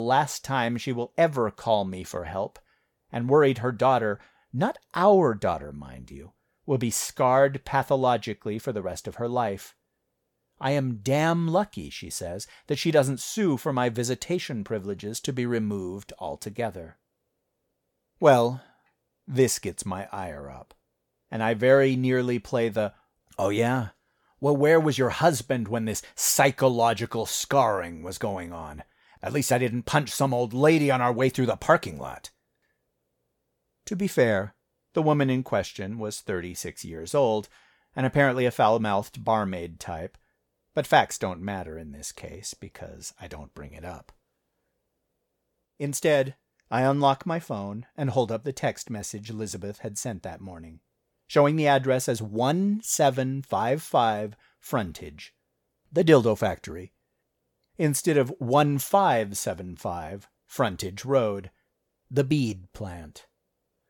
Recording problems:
abrupt cut into speech; at the start

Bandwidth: 18 kHz